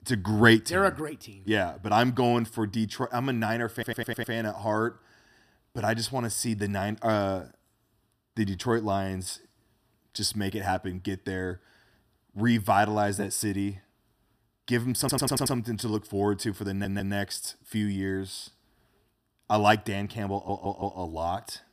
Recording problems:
audio stuttering; 4 times, first at 3.5 s

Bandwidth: 15 kHz